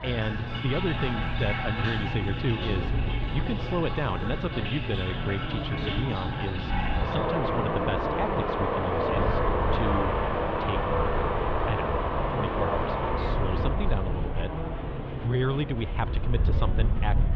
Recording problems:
muffled; very; fading above 3.5 kHz
rain or running water; very loud; until 14 s; 2 dB above the speech
chatter from many people; loud; throughout; 5 dB below the speech
wind noise on the microphone; occasional gusts; 15 dB below the speech

